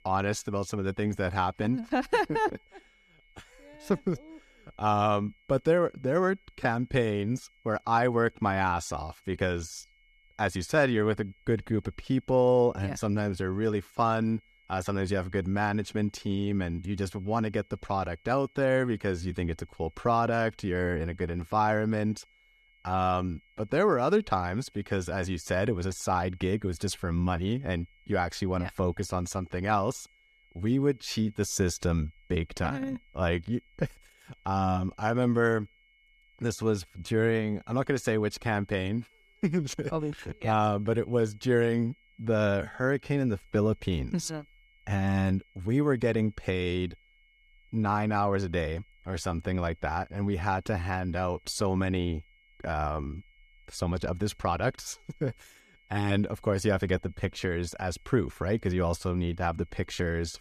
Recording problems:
high-pitched whine; faint; throughout; 2 kHz, 35 dB below the speech

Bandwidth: 14.5 kHz